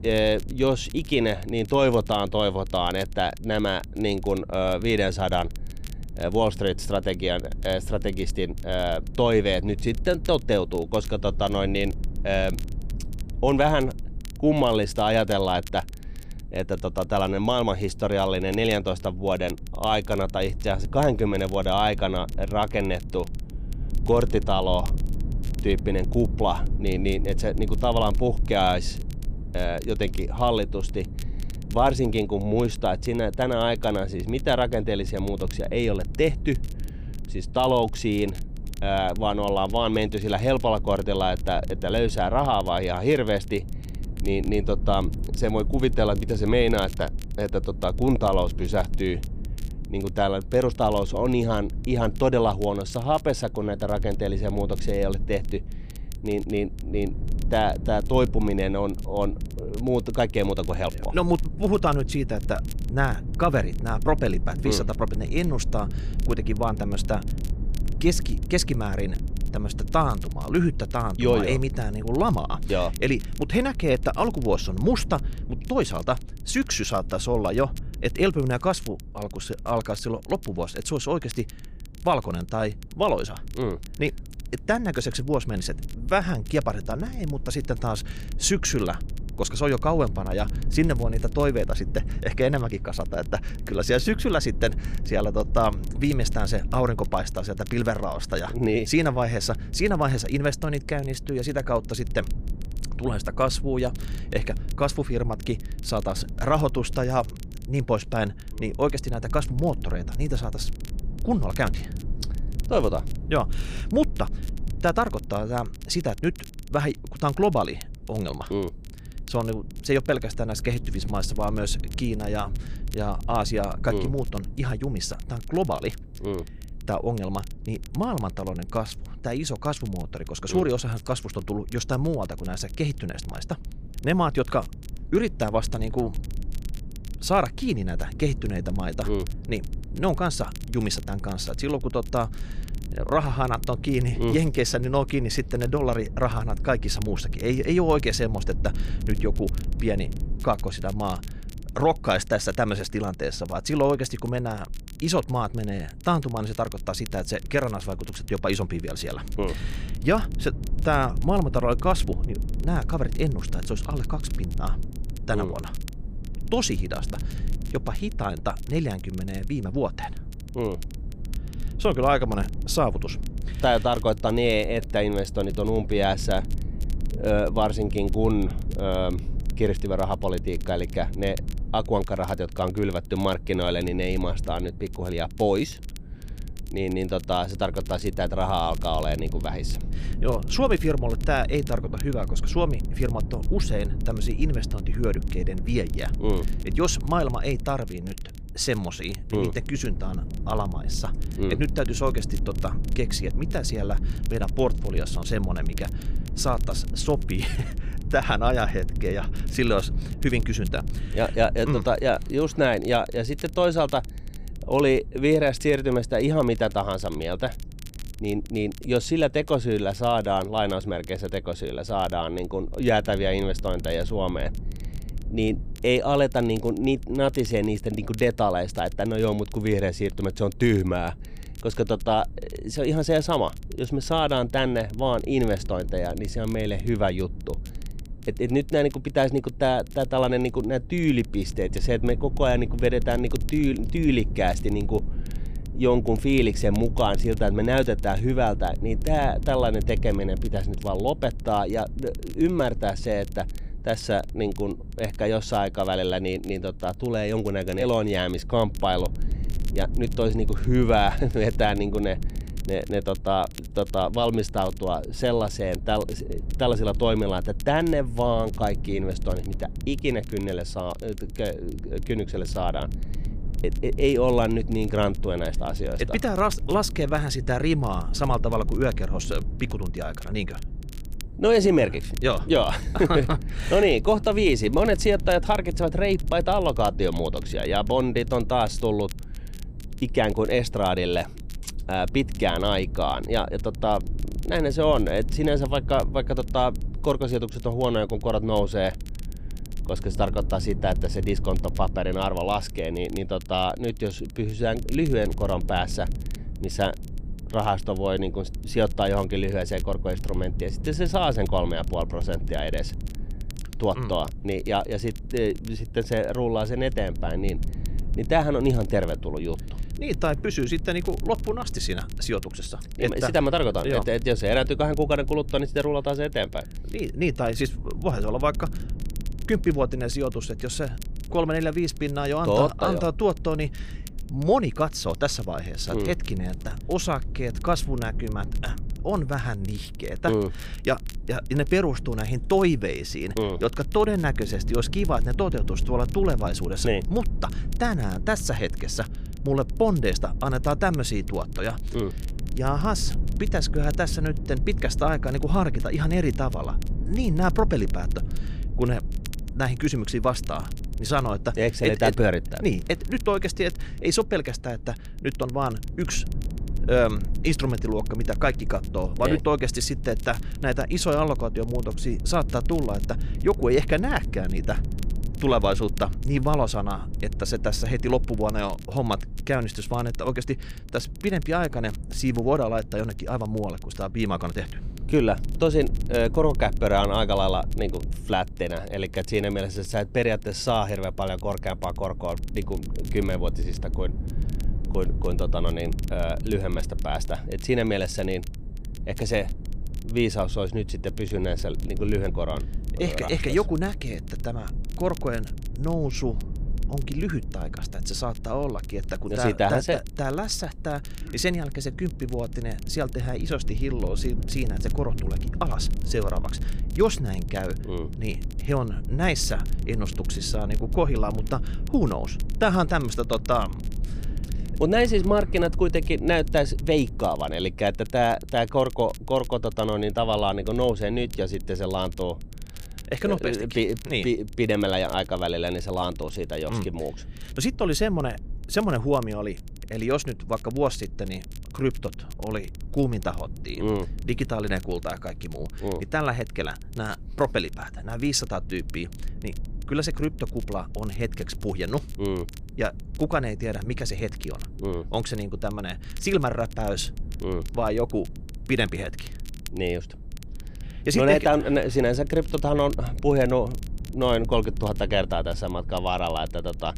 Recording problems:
low rumble; faint; throughout; 20 dB below the speech
crackle, like an old record; faint; 25 dB below the speech

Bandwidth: 15 kHz